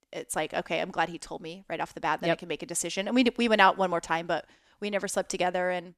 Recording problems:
none

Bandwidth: 13.5 kHz